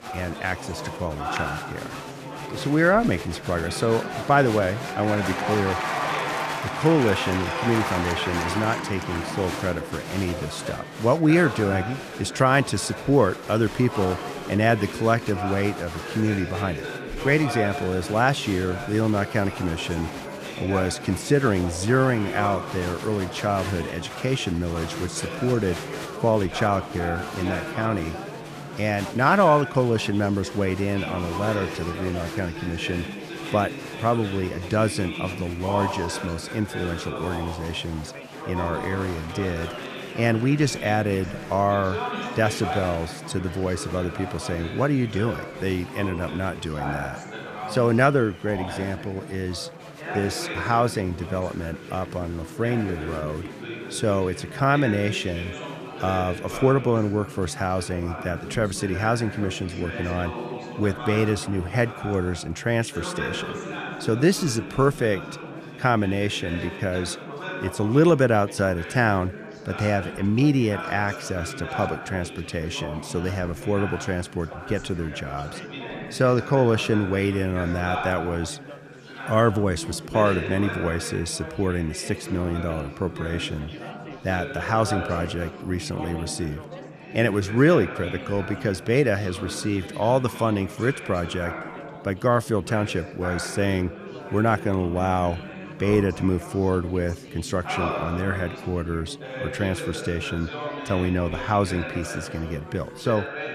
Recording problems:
chatter from many people; loud; throughout; 8 dB below the speech

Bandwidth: 14.5 kHz